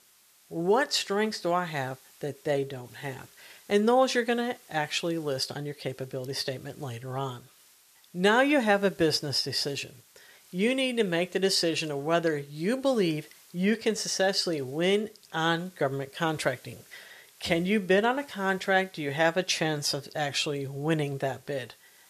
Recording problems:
hiss; faint; throughout; 25 dB below the speech

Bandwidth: 14.5 kHz